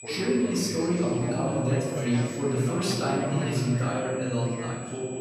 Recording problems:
off-mic speech; far
room echo; noticeable; dies away in 1.4 s
background chatter; loud; throughout; 2 voices, 7 dB below the speech
high-pitched whine; noticeable; throughout; 8 kHz, 15 dB below the speech

